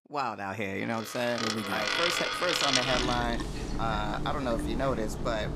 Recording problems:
household noises; very loud; from 1.5 s on; 1 dB above the speech

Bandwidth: 15 kHz